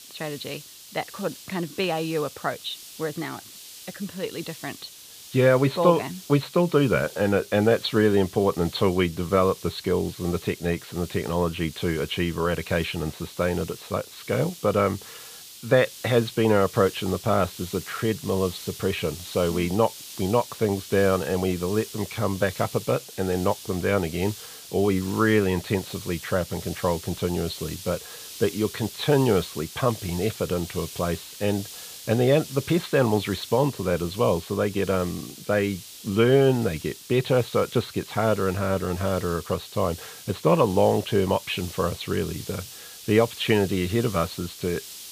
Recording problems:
high frequencies cut off; severe; nothing above 4.5 kHz
hiss; noticeable; throughout; 15 dB below the speech

